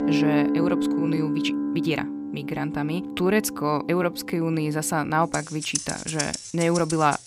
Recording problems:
background music; loud; throughout; 3 dB below the speech
uneven, jittery; strongly; from 0.5 to 6.5 s

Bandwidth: 15 kHz